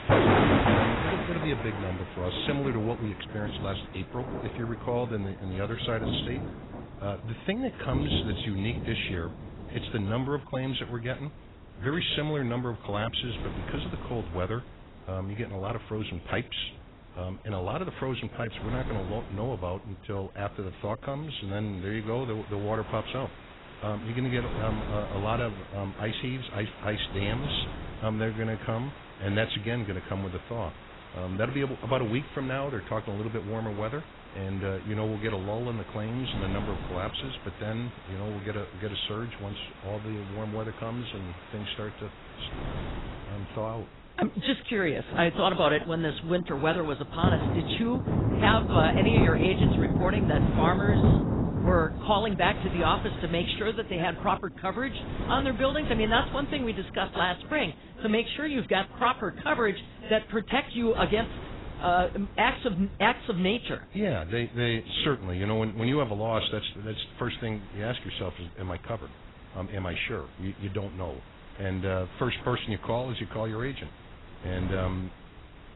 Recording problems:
garbled, watery; badly; nothing above 4 kHz
rain or running water; very loud; throughout; 1 dB above the speech
wind noise on the microphone; occasional gusts; 20 dB below the speech

